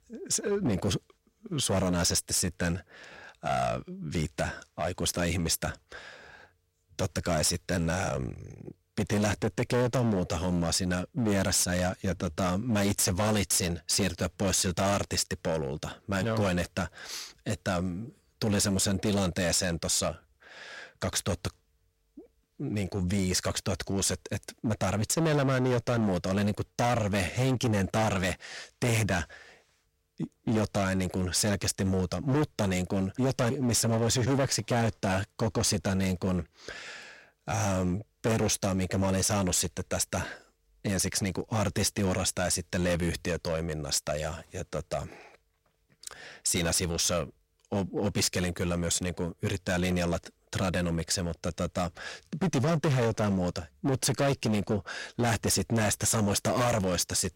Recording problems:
distortion; heavy; 12% of the sound clipped

